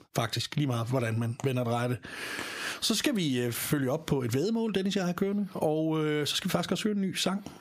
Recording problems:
squashed, flat; heavily

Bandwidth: 15 kHz